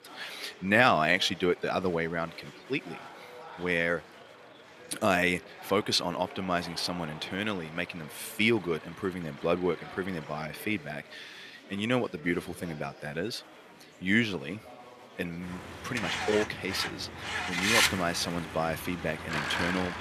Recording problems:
thin; very slightly; fading below 650 Hz
traffic noise; loud; throughout; 1 dB below the speech
chatter from many people; noticeable; throughout; 20 dB below the speech

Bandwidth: 14.5 kHz